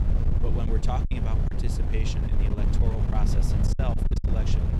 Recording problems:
wind noise on the microphone; heavy; 1 dB below the speech
choppy; very; at 0.5 s, at 2.5 s and at 3.5 s; 12% of the speech affected

